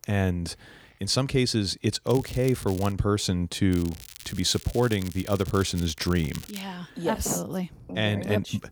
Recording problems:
crackling; noticeable; at 2 s and from 3.5 to 6.5 s; 15 dB below the speech

